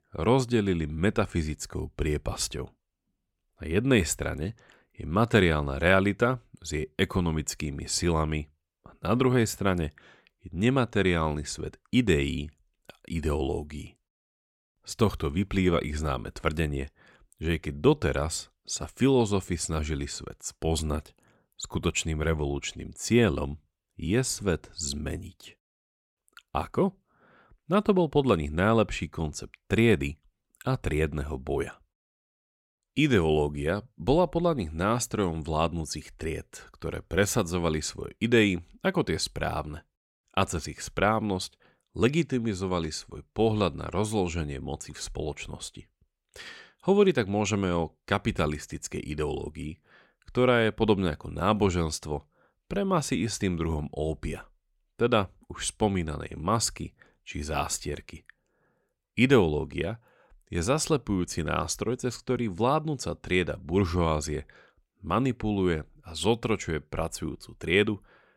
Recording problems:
none

